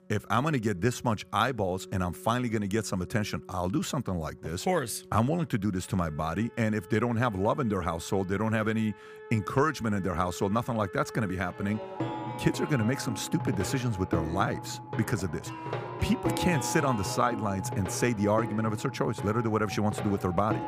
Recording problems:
background music; loud; throughout; 9 dB below the speech

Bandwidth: 15 kHz